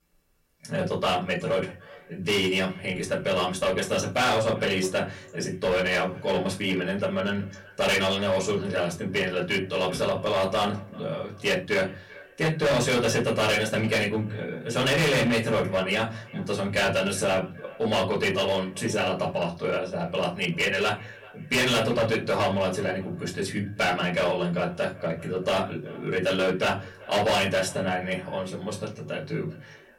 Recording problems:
distortion; heavy; 10% of the sound clipped
off-mic speech; far
echo of what is said; faint; throughout; 390 ms later, 20 dB below the speech
room echo; very slight; dies away in 0.3 s

